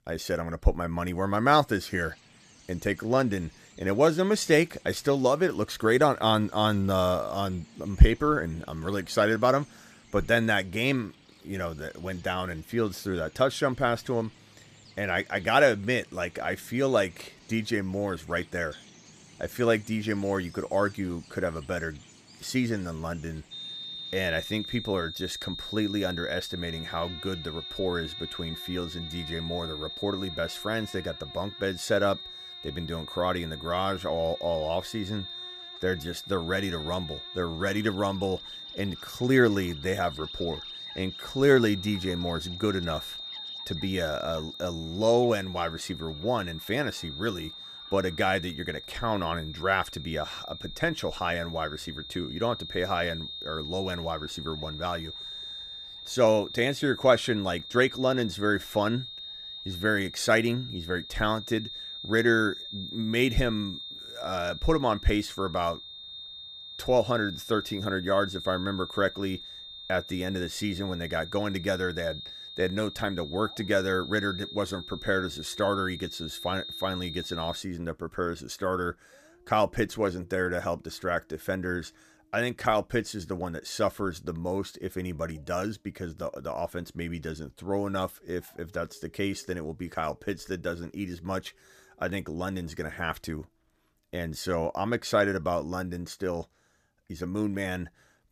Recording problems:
high-pitched whine; loud; from 24 s to 1:18; 3.5 kHz, 10 dB below the speech
animal sounds; faint; throughout; 25 dB below the speech

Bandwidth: 14.5 kHz